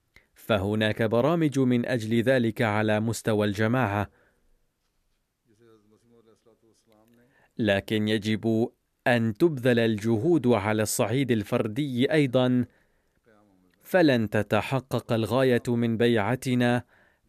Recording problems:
none

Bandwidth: 14.5 kHz